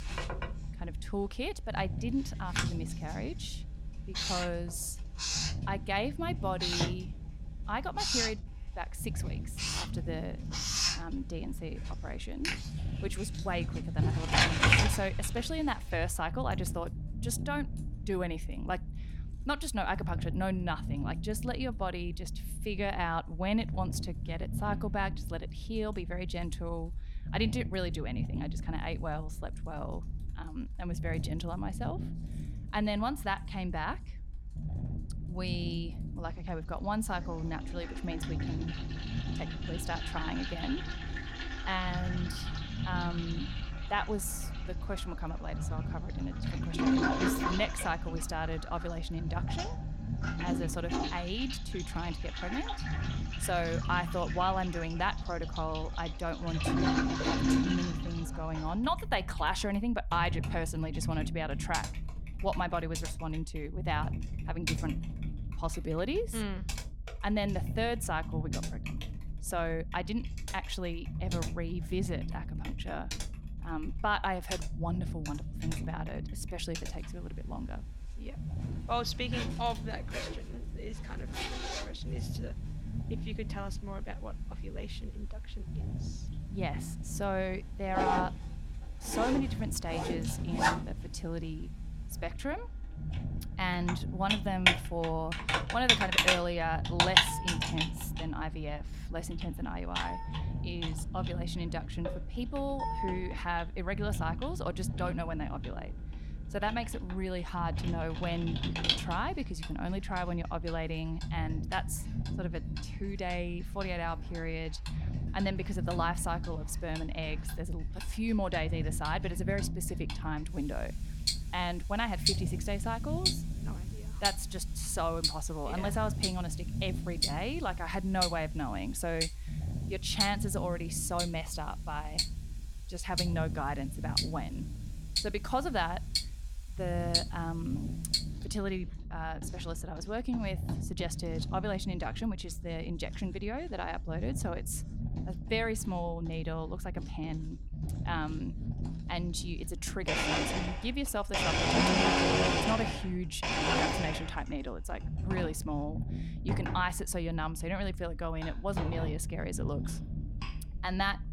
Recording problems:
household noises; very loud; throughout; 3 dB above the speech
low rumble; noticeable; throughout; 15 dB below the speech

